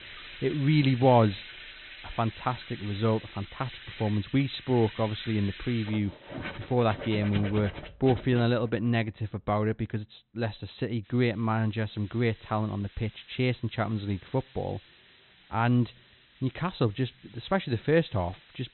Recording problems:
high frequencies cut off; severe; nothing above 4 kHz
household noises; noticeable; until 8.5 s; 15 dB below the speech
hiss; faint; until 7 s and from 11 s on; 25 dB below the speech

